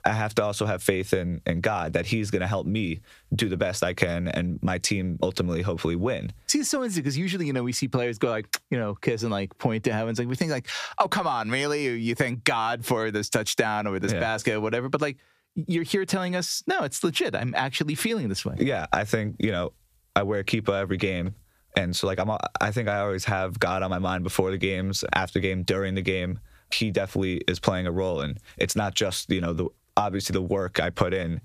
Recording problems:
squashed, flat; somewhat

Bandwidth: 14.5 kHz